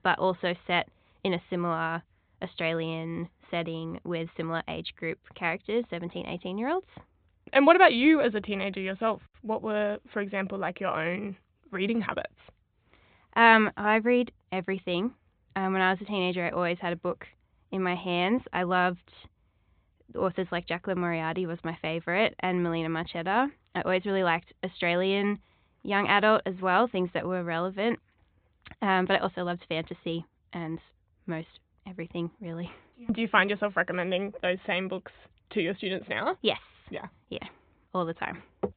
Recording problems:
high frequencies cut off; severe; nothing above 4 kHz

